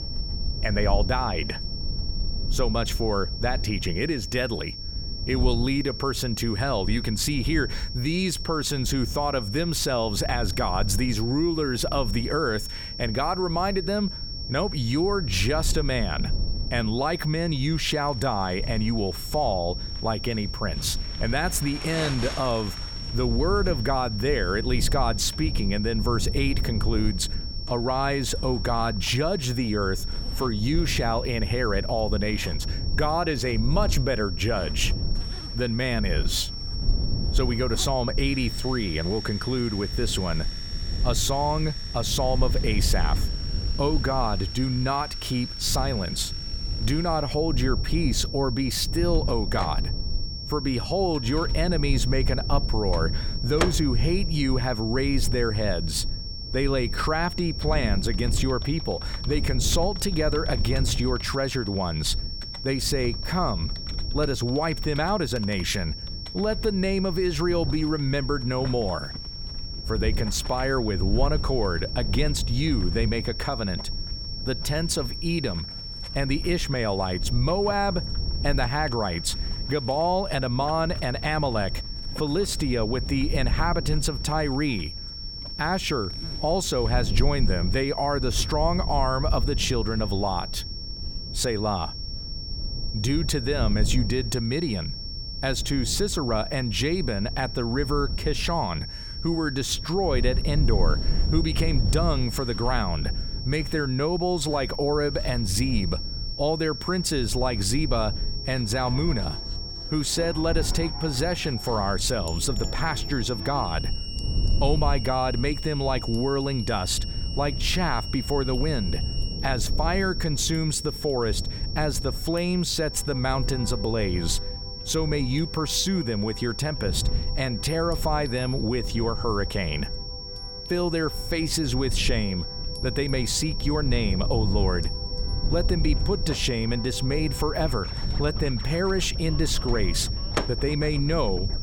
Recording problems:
high-pitched whine; loud; throughout; 5.5 kHz, 8 dB below the speech
household noises; noticeable; throughout; 20 dB below the speech
background music; noticeable; from 1:48 on; 20 dB below the speech
low rumble; noticeable; throughout; 20 dB below the speech

